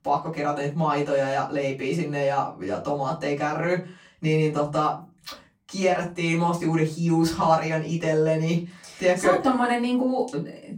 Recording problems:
off-mic speech; far
room echo; very slight; dies away in 0.3 s

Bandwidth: 16.5 kHz